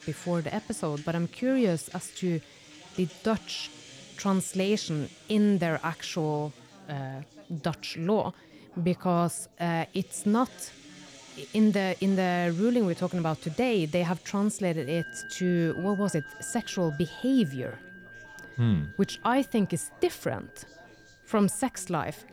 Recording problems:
background music; noticeable; throughout; 20 dB below the speech
background chatter; faint; throughout; 4 voices, 25 dB below the speech

